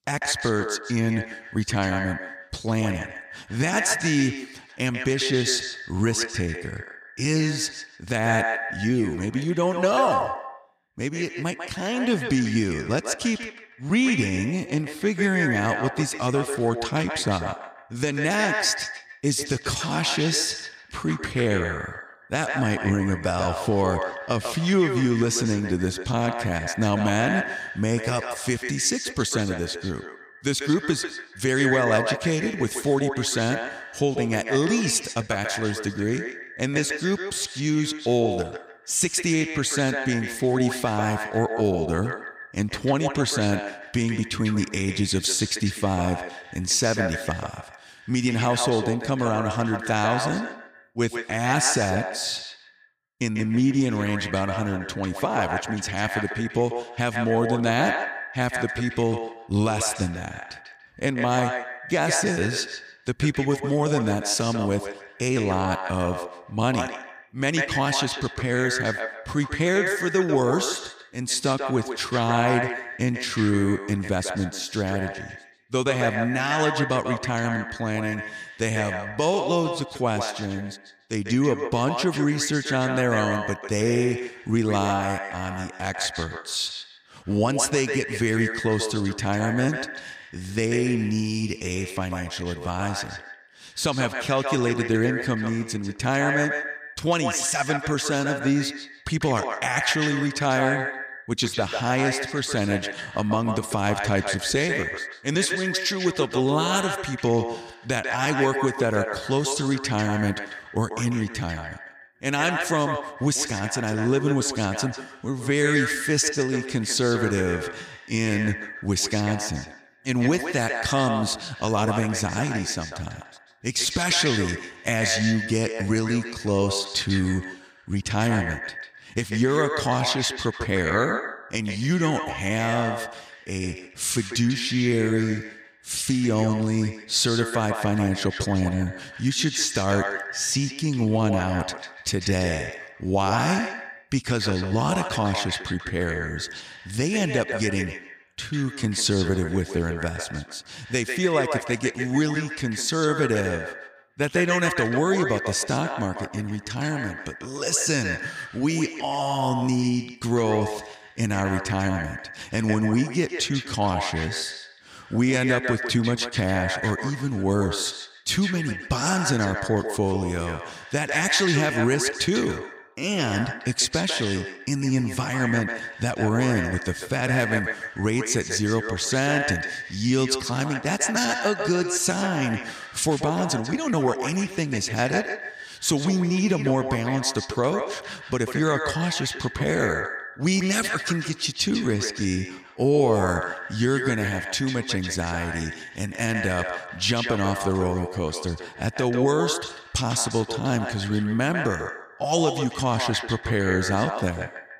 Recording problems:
echo of what is said; strong; throughout; 150 ms later, 6 dB below the speech

